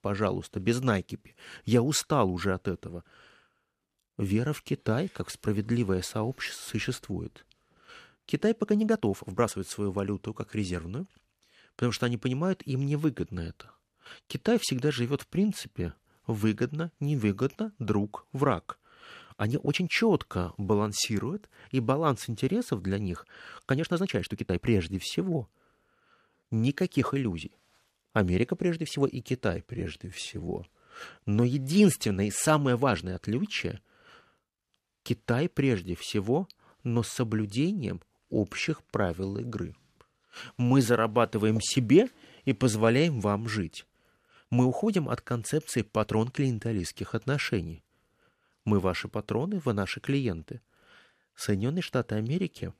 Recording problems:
uneven, jittery; strongly; from 8.5 to 46 s

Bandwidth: 14 kHz